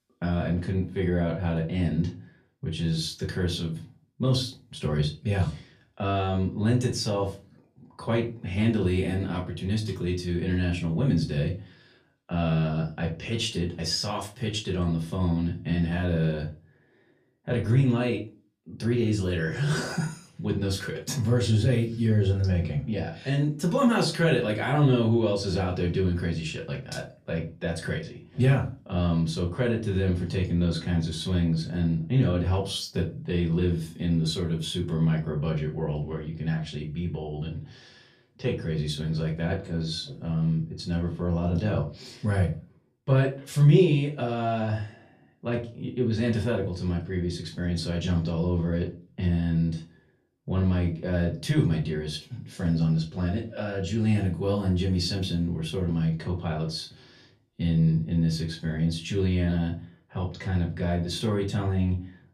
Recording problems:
off-mic speech; far
room echo; very slight; dies away in 0.3 s

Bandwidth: 14.5 kHz